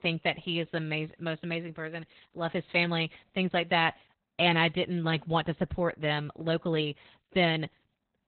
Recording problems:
garbled, watery; badly; nothing above 4 kHz

